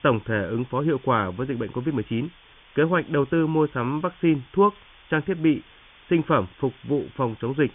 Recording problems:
high frequencies cut off; severe; nothing above 3.5 kHz
hiss; faint; throughout; 25 dB below the speech

